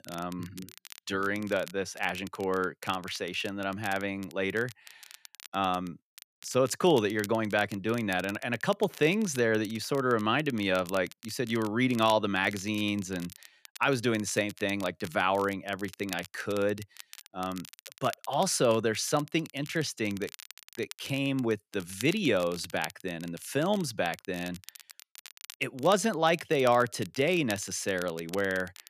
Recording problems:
crackle, like an old record; noticeable; 20 dB below the speech

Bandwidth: 14.5 kHz